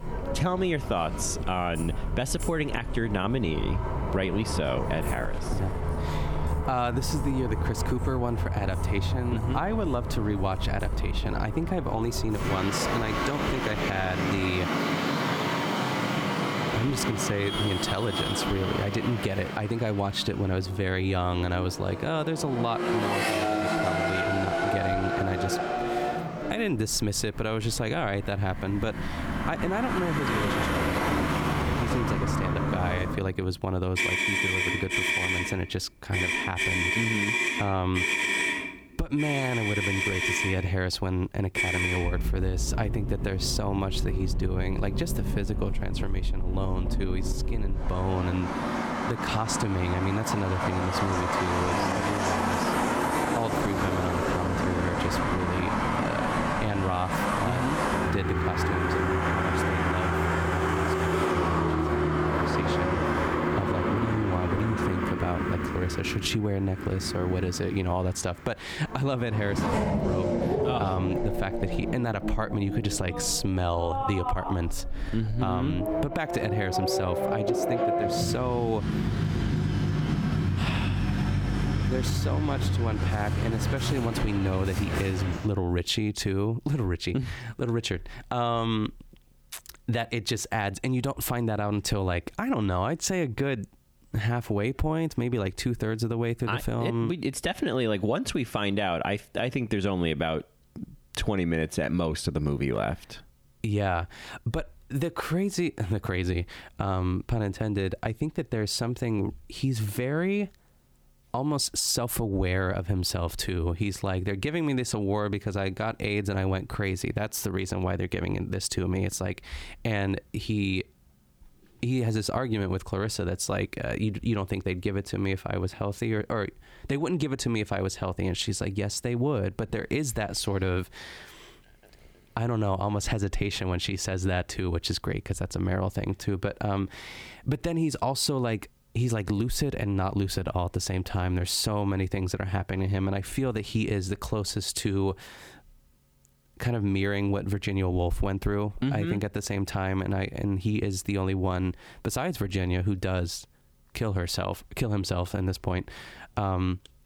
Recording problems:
squashed, flat; somewhat, background pumping
traffic noise; very loud; until 1:25; 1 dB above the speech

